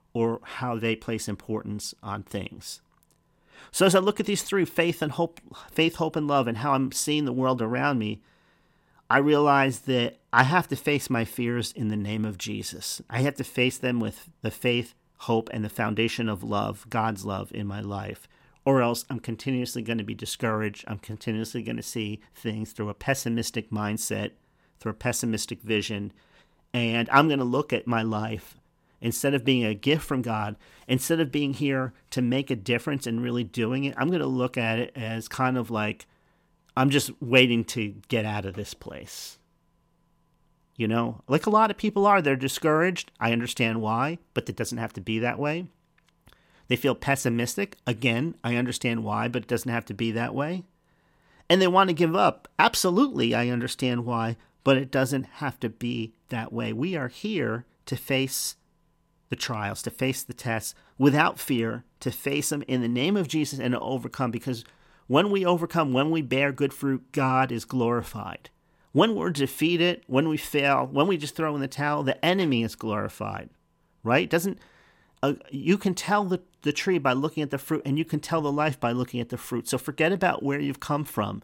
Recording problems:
none

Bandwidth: 16.5 kHz